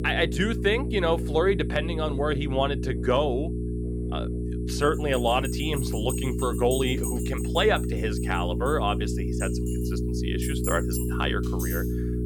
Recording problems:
electrical hum; loud; throughout; 60 Hz, 9 dB below the speech
alarms or sirens; noticeable; throughout; 10 dB below the speech
high-pitched whine; faint; throughout; 10.5 kHz, 35 dB below the speech

